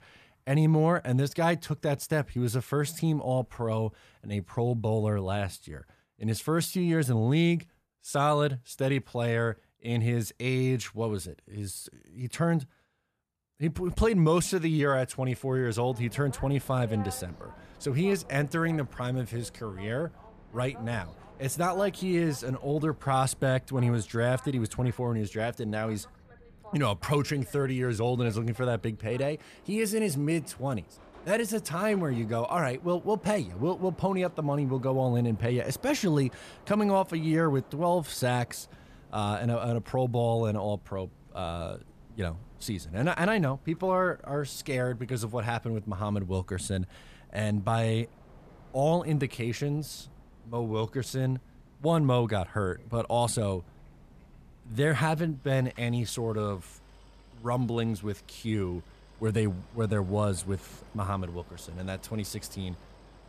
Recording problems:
train or aircraft noise; faint; from 16 s on; 25 dB below the speech

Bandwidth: 14.5 kHz